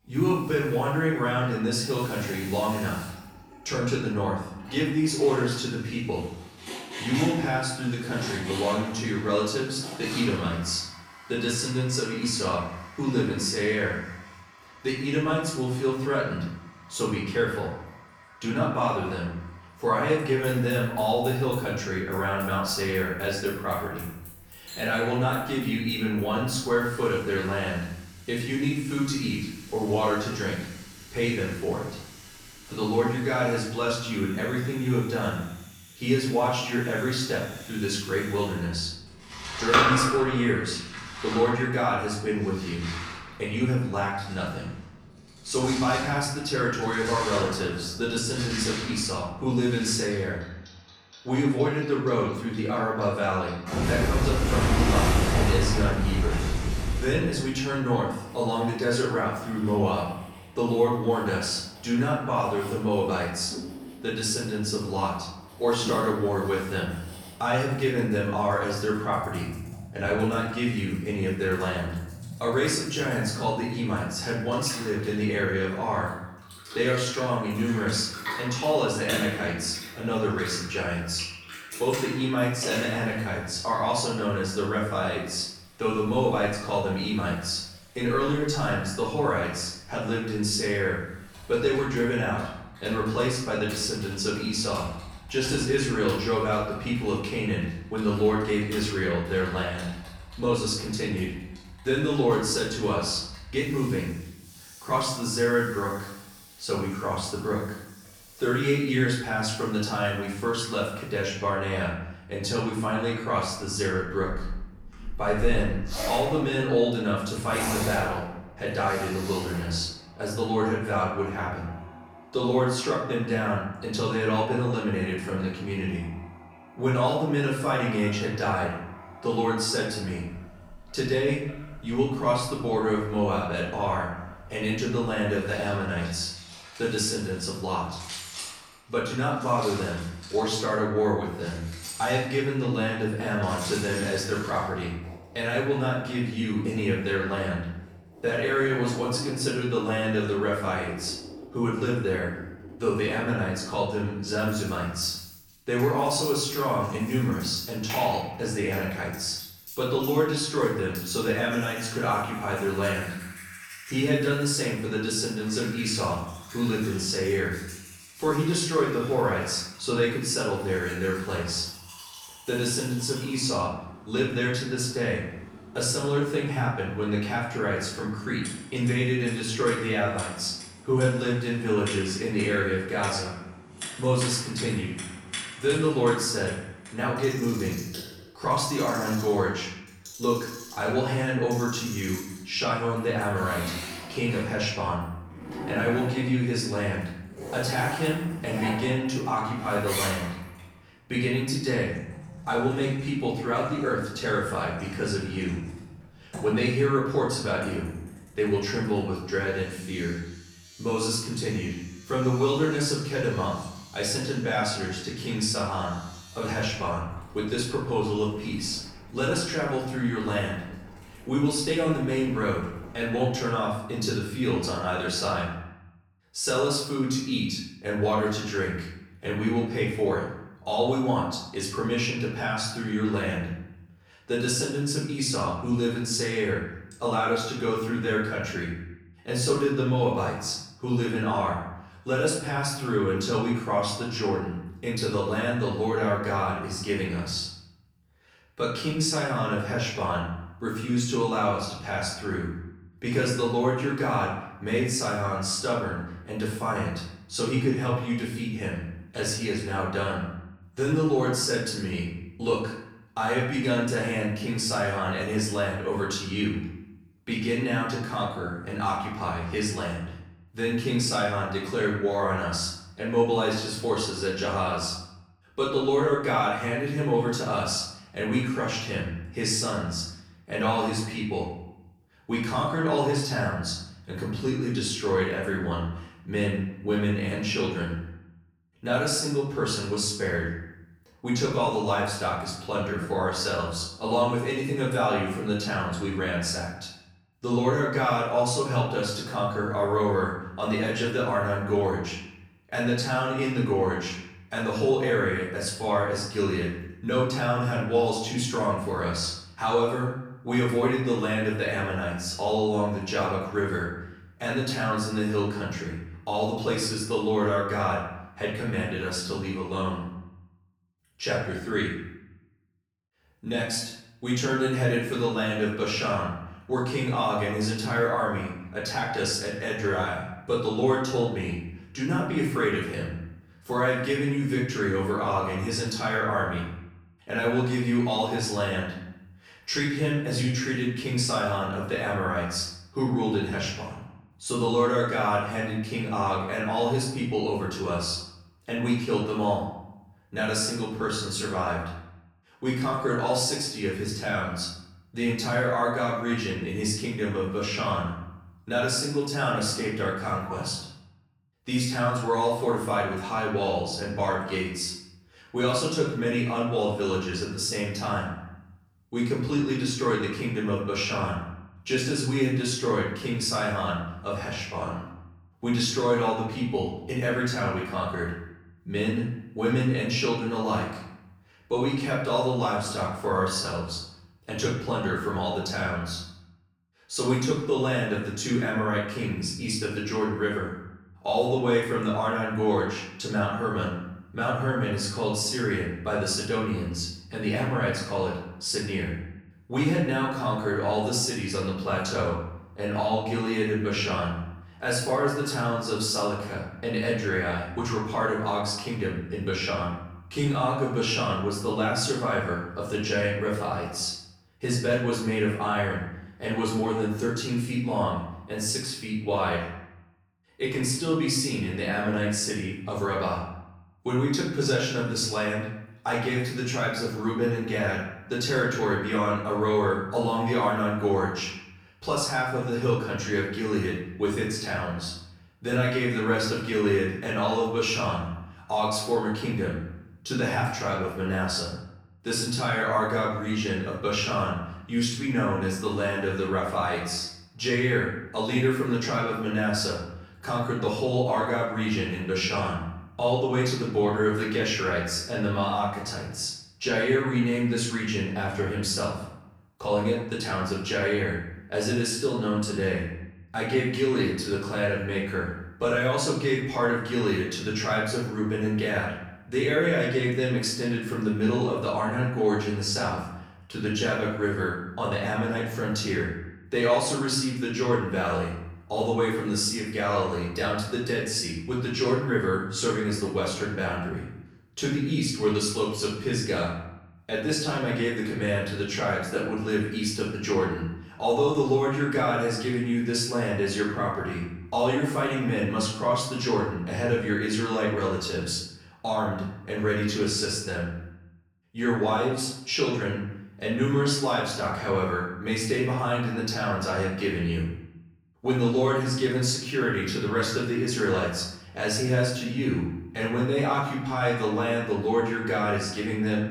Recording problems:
off-mic speech; far
room echo; noticeable; dies away in 0.7 s
household noises; noticeable; until 3:44; 10 dB below the speech

